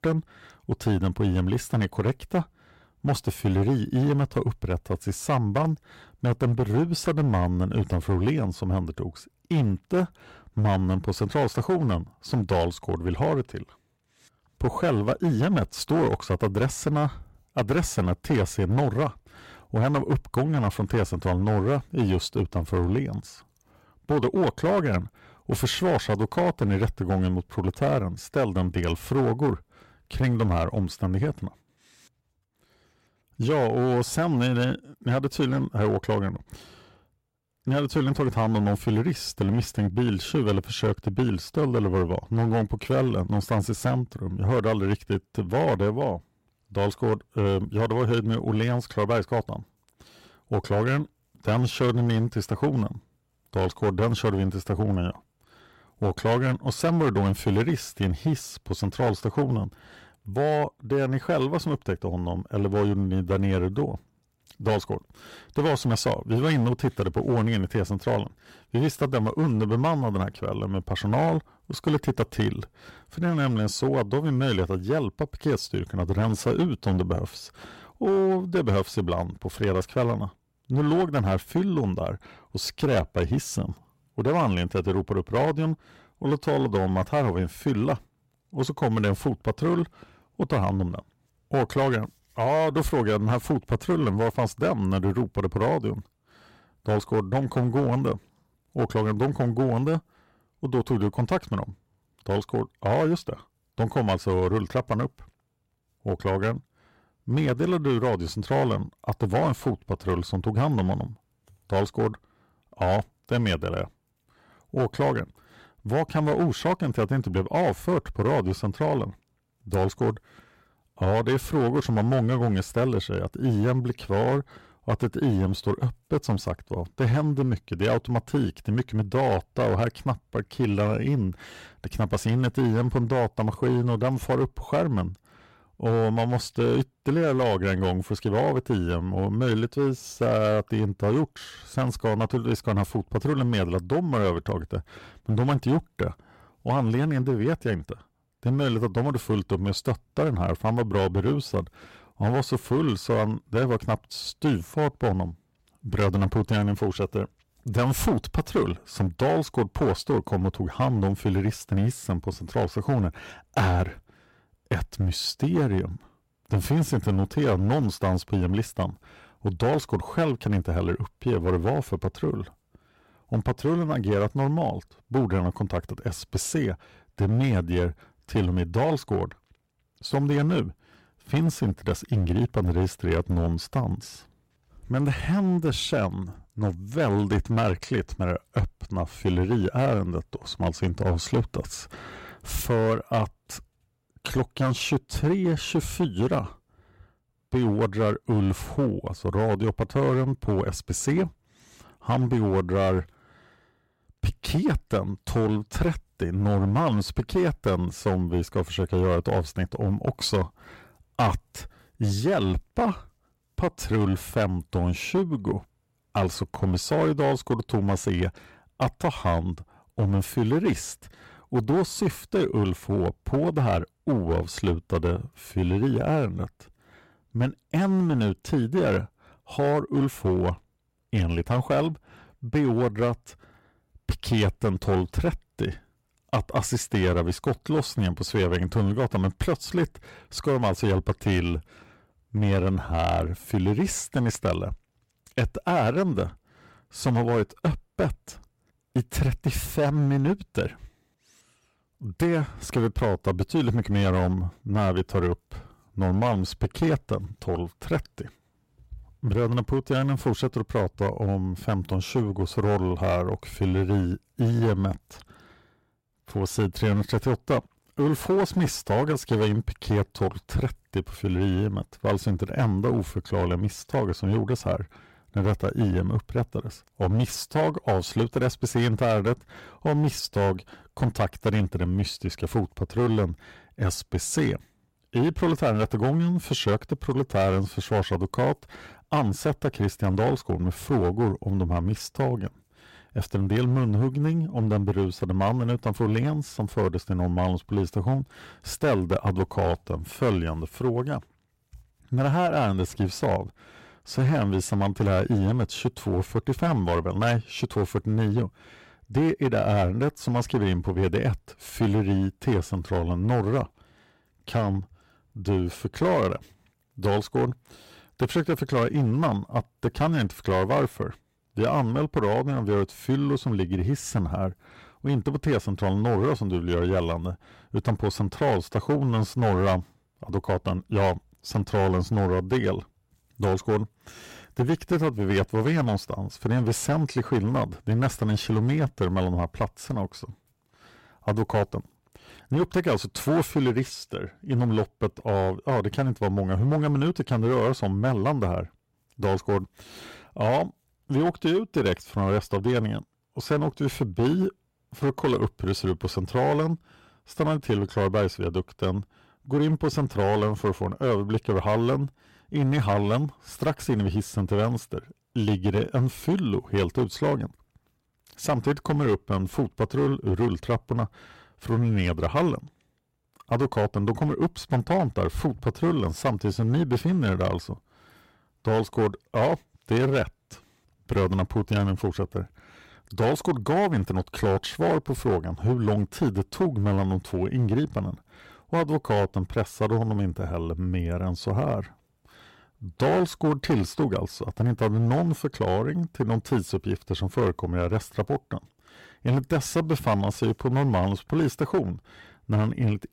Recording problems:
distortion; slight; 7% of the sound clipped

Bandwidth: 16 kHz